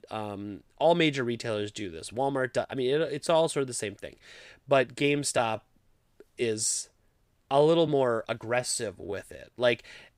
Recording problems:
uneven, jittery; strongly; from 0.5 to 9.5 s

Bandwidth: 15.5 kHz